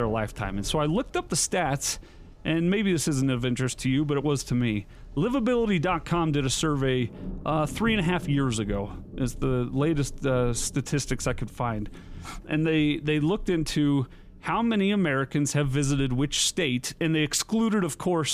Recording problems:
rain or running water; noticeable; throughout; 20 dB below the speech
abrupt cut into speech; at the start and the end

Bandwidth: 15 kHz